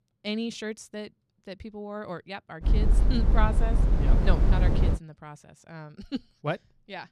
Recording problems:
low rumble; loud; from 2.5 to 5 s; 1 dB below the speech

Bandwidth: 14.5 kHz